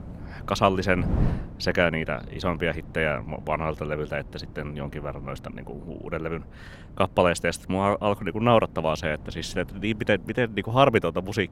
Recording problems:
wind noise on the microphone; occasional gusts; 20 dB below the speech

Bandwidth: 16 kHz